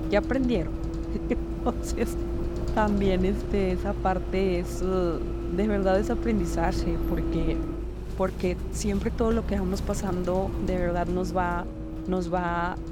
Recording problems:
traffic noise; loud; throughout; 4 dB below the speech

